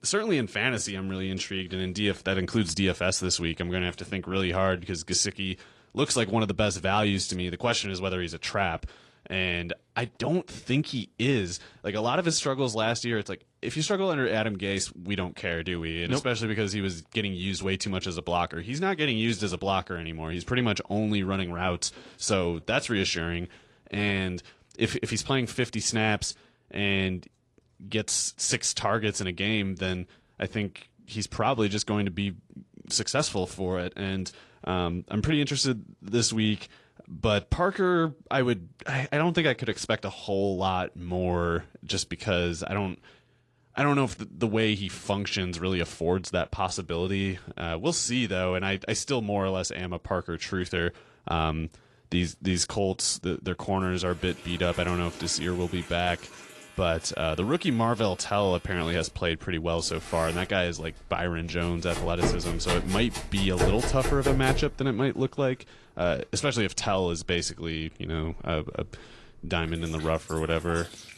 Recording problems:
garbled, watery; slightly
household noises; loud; from 54 s on; 7 dB below the speech

